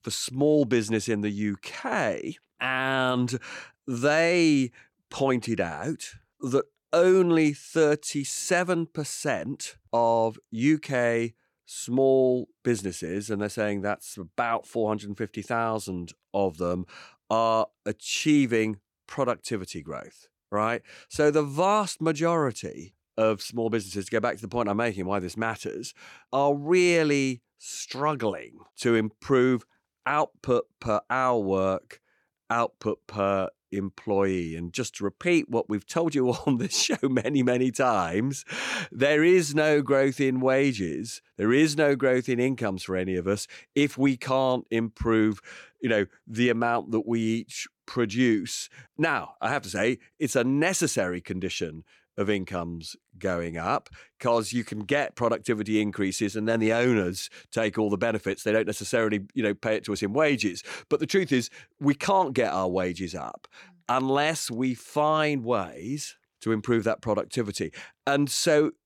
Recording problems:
none

